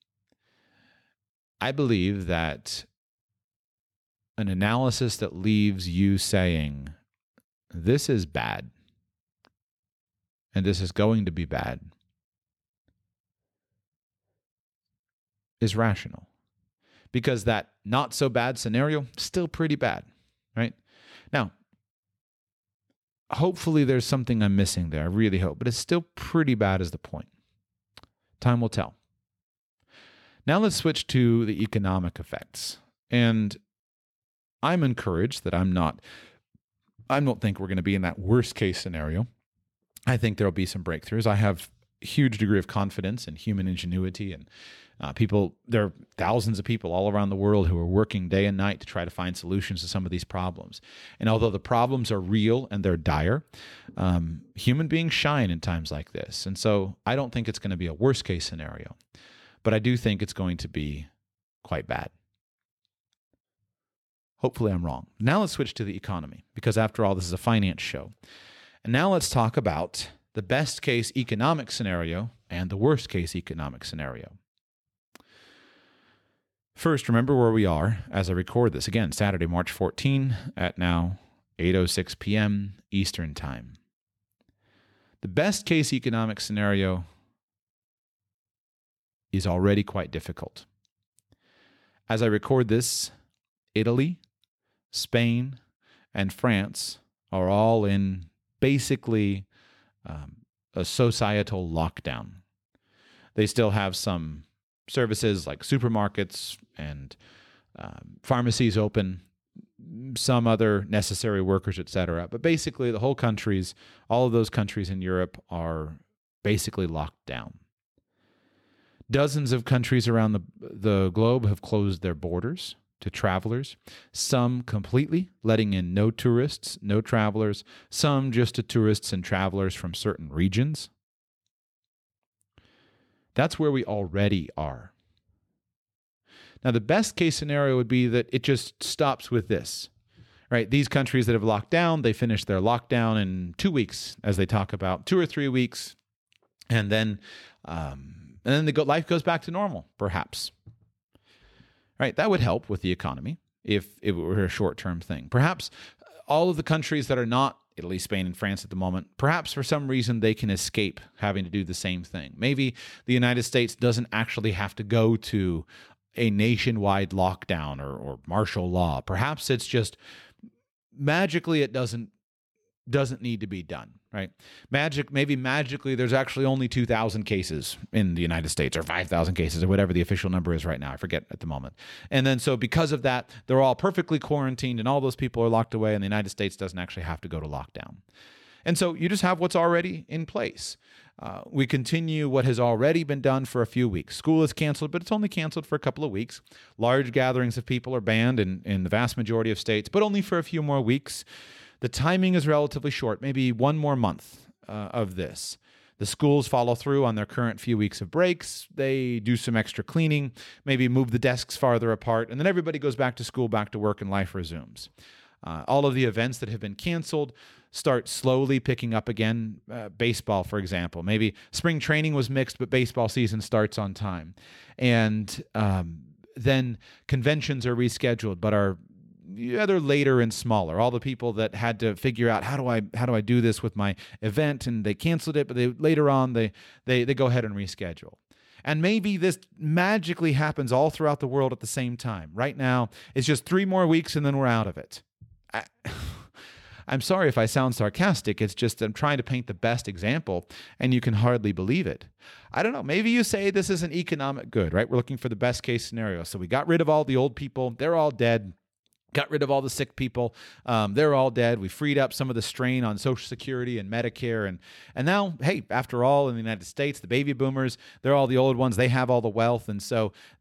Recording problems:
none

